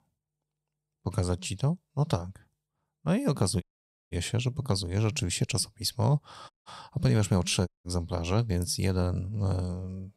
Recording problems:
audio cutting out; at 3.5 s, at 6.5 s and at 7.5 s

